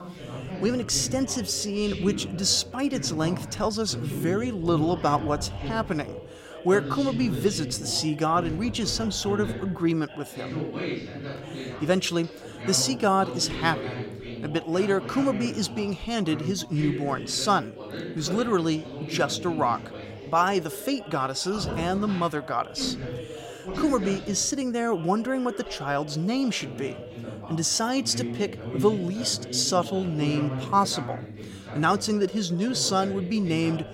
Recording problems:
background chatter; loud; throughout; 3 voices, 9 dB below the speech

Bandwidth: 16.5 kHz